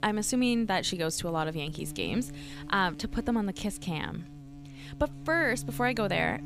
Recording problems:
electrical hum; faint; throughout; 60 Hz, 20 dB below the speech

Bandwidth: 15 kHz